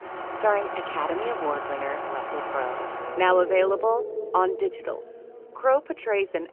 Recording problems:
phone-call audio; nothing above 3 kHz
traffic noise; loud; throughout; 7 dB below the speech

